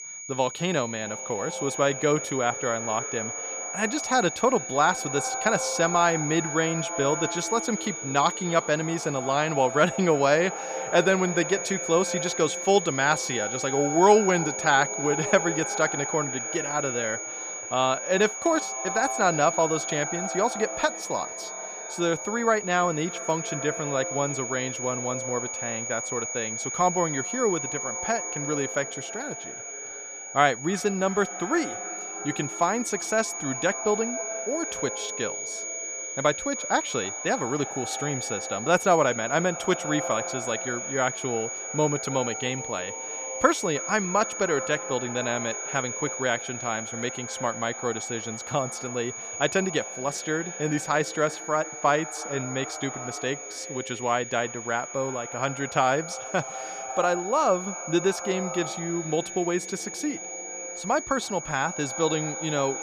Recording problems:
echo of what is said; noticeable; throughout; 310 ms later, 10 dB below the speech
high-pitched whine; loud; throughout; 6.5 kHz, 6 dB below the speech

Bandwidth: 15 kHz